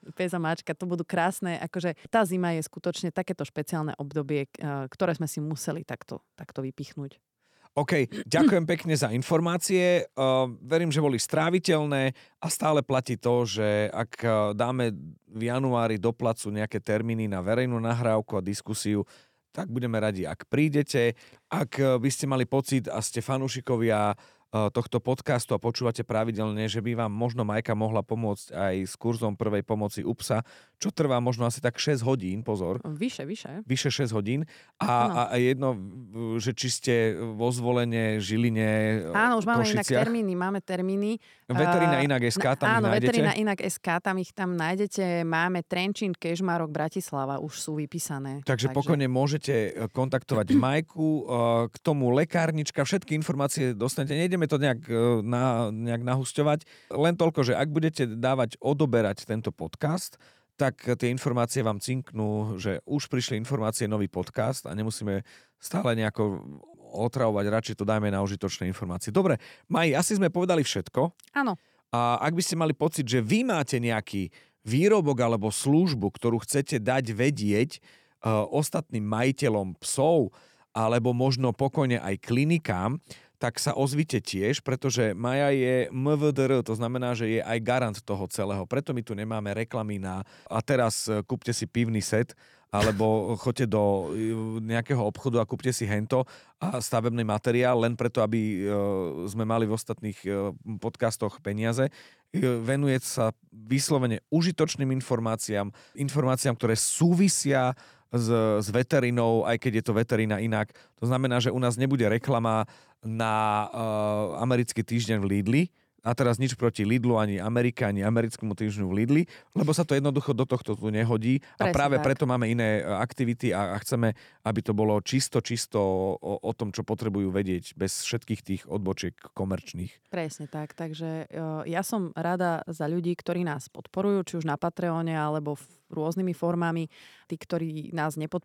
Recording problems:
none

